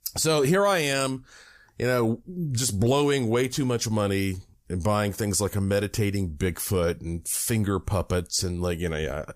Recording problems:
none

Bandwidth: 15 kHz